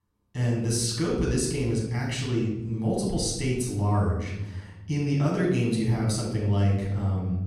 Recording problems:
off-mic speech; far
room echo; noticeable; dies away in 1 s

